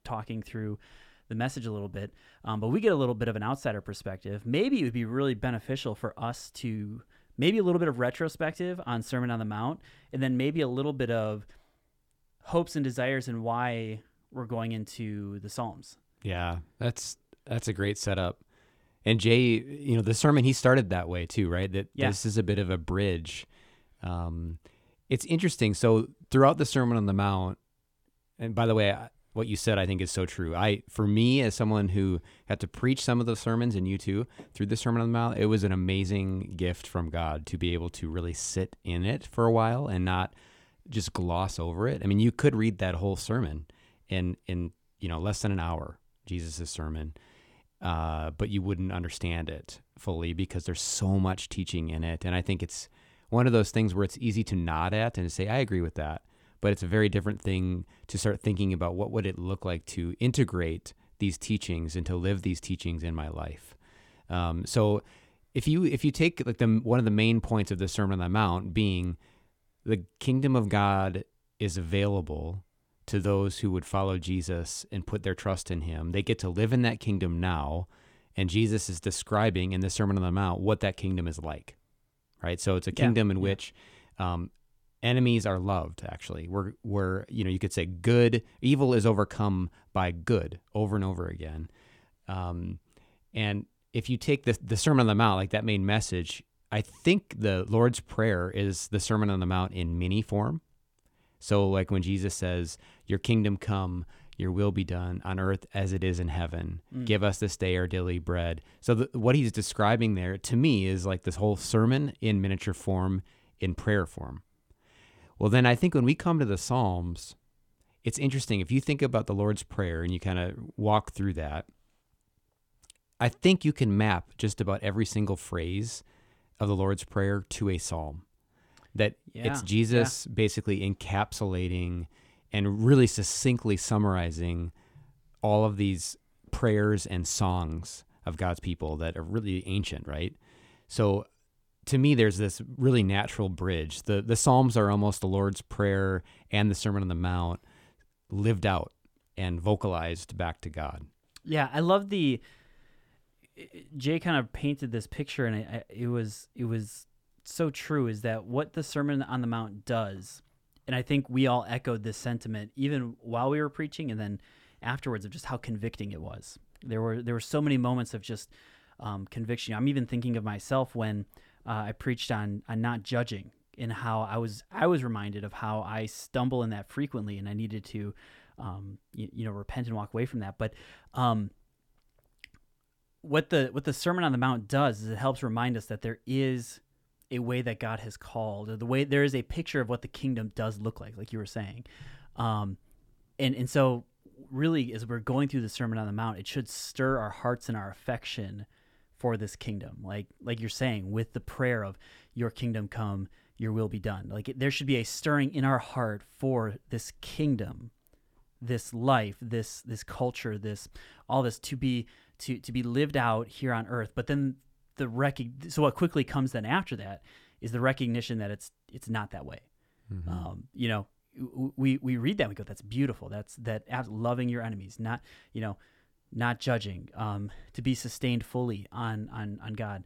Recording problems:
none

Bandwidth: 18 kHz